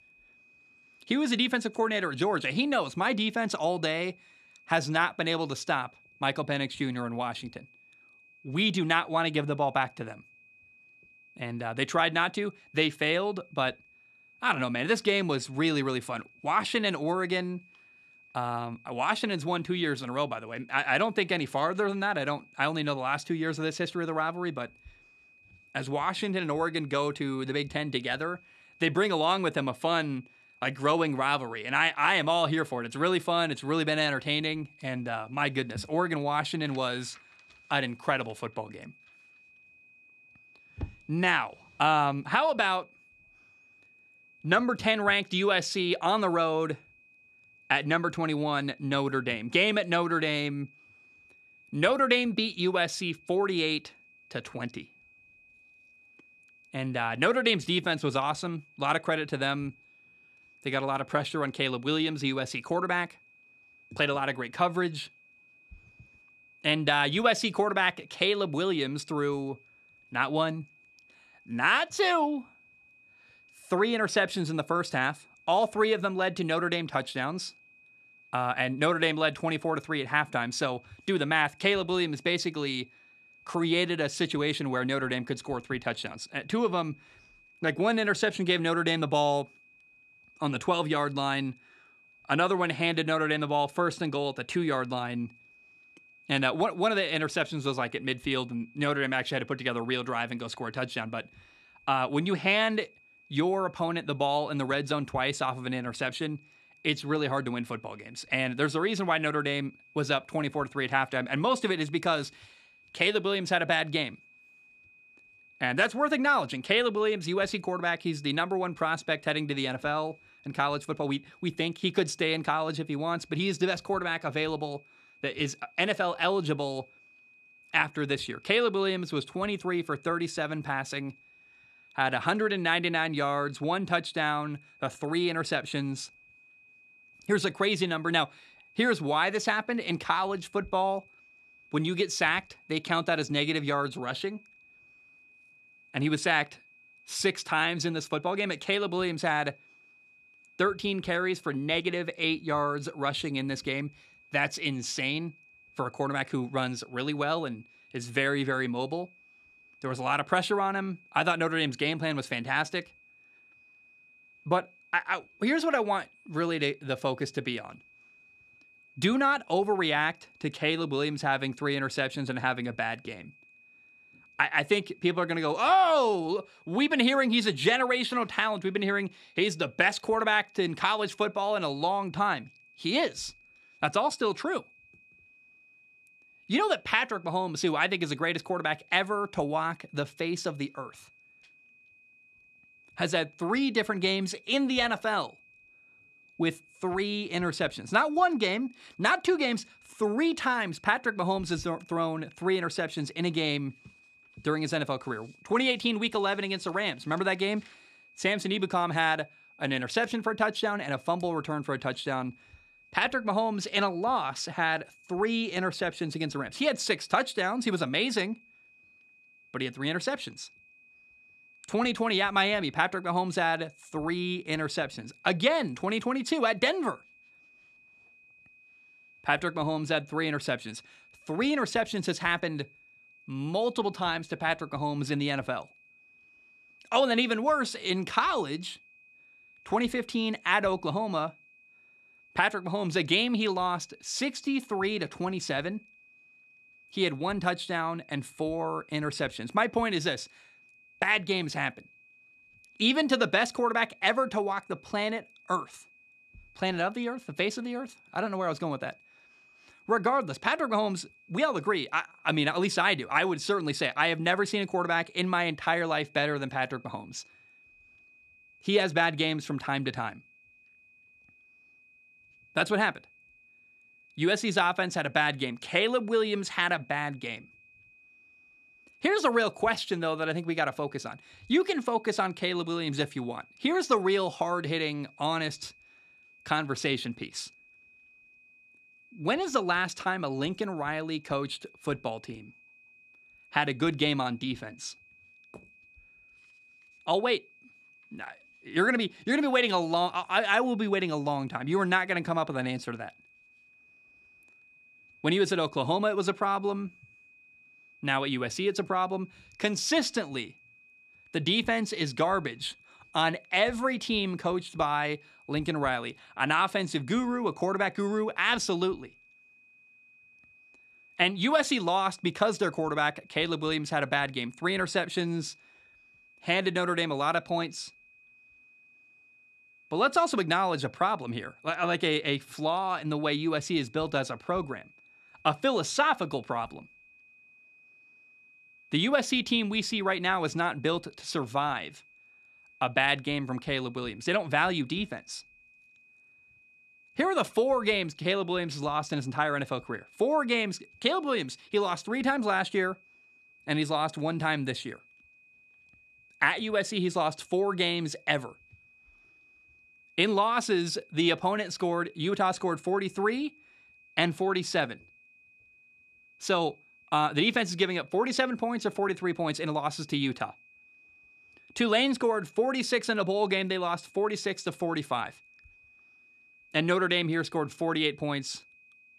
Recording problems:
high-pitched whine; faint; throughout; 2.5 kHz, 30 dB below the speech

